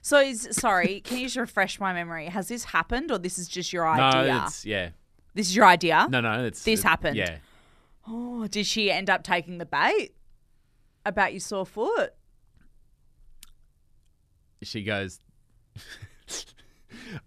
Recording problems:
none

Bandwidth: 14 kHz